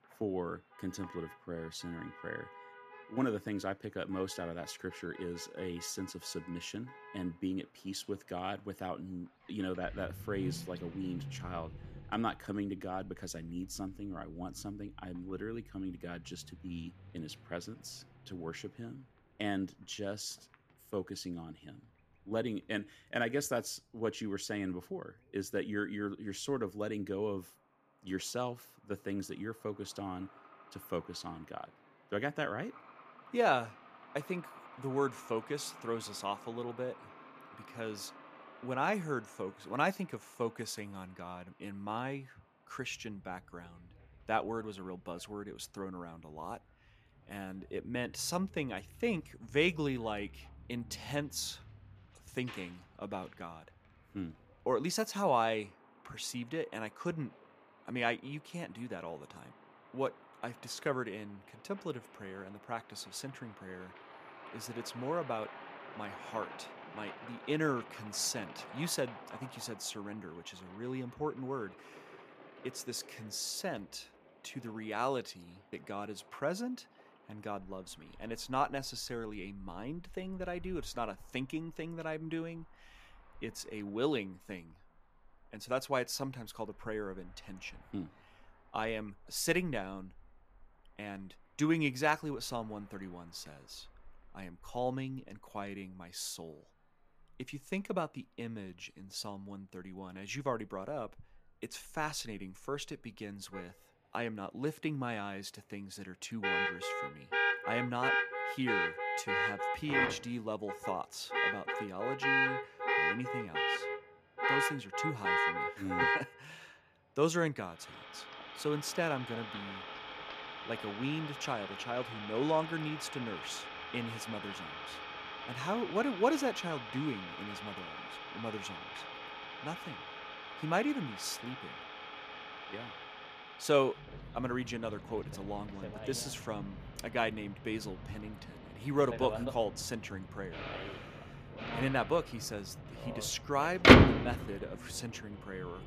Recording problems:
traffic noise; very loud; throughout; 3 dB above the speech

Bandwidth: 14.5 kHz